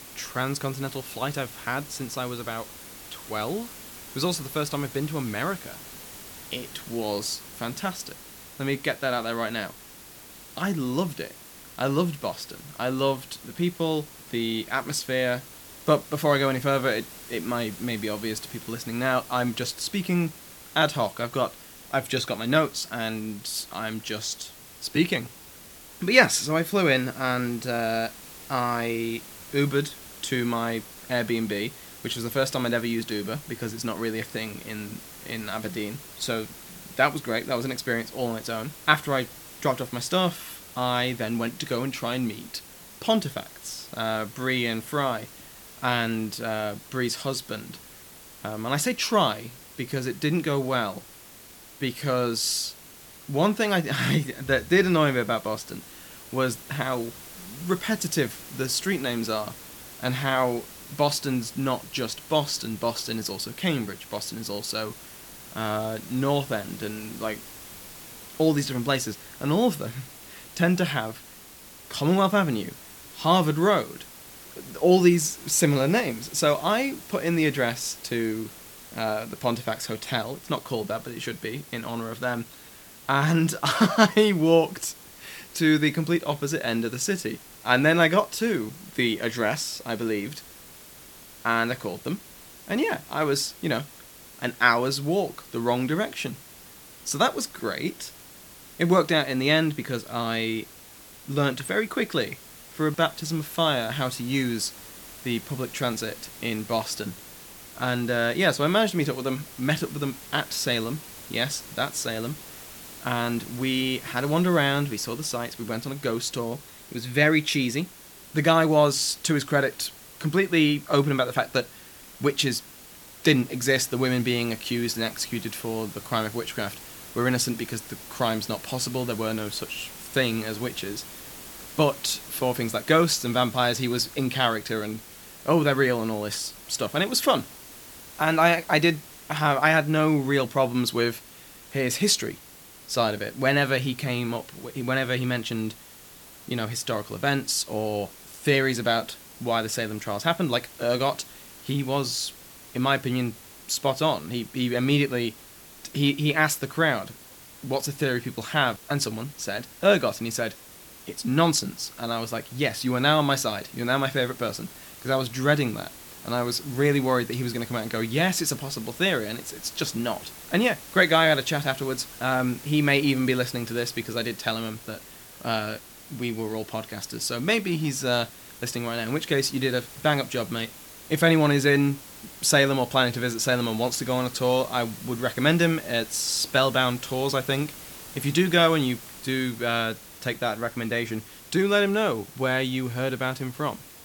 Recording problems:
hiss; noticeable; throughout; 15 dB below the speech

